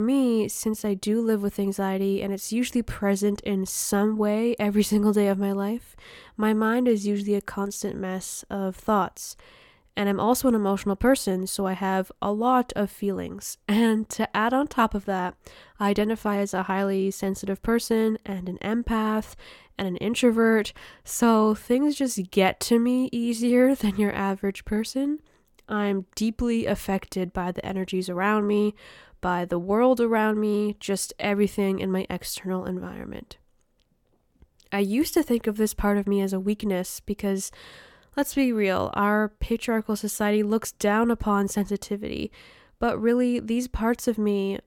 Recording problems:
abrupt cut into speech; at the start

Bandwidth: 17 kHz